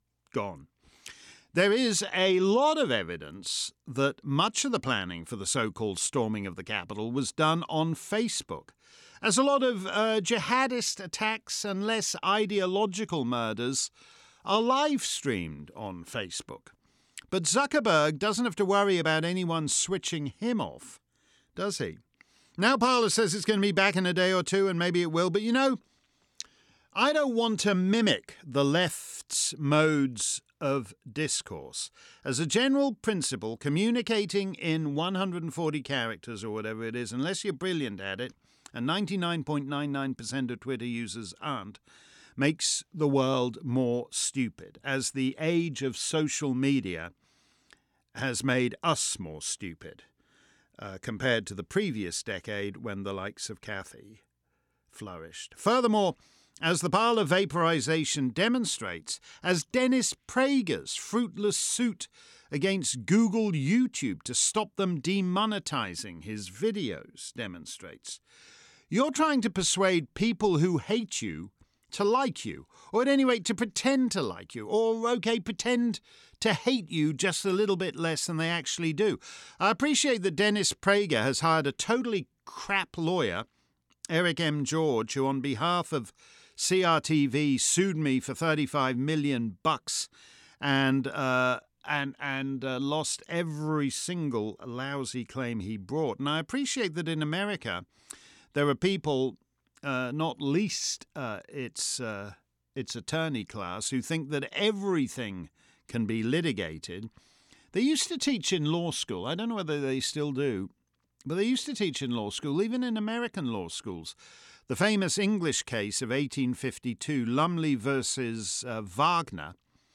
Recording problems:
none

